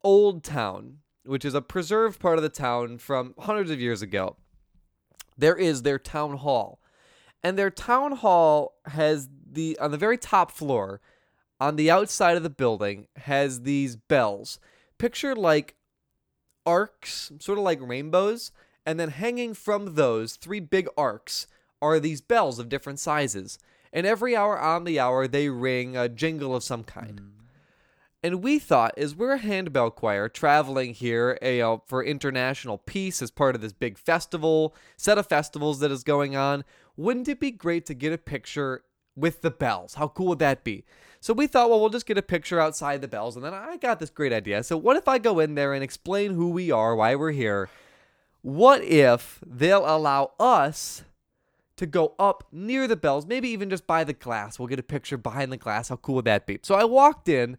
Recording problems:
none

